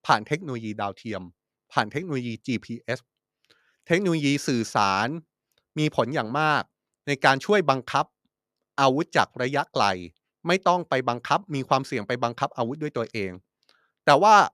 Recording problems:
none

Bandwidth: 15 kHz